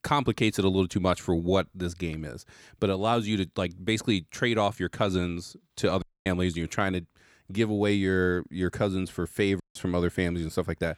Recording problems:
audio cutting out; at 6 s and at 9.5 s

